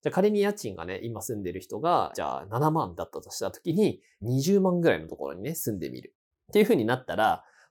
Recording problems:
none

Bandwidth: 18 kHz